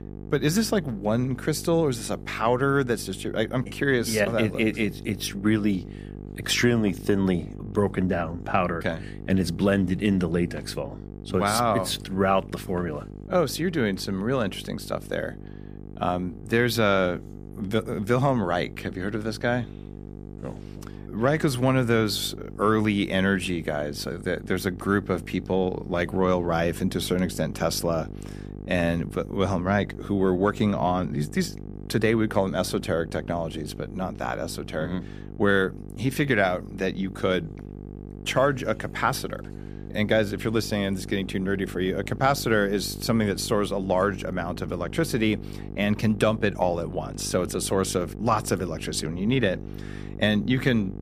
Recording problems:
electrical hum; noticeable; throughout; 50 Hz, 20 dB below the speech

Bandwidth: 15 kHz